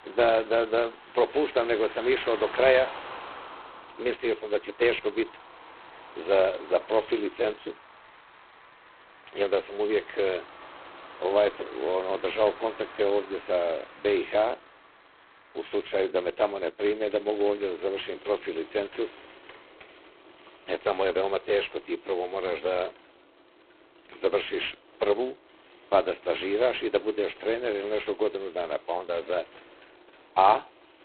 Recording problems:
phone-call audio; poor line; nothing above 4 kHz
traffic noise; noticeable; throughout; 20 dB below the speech

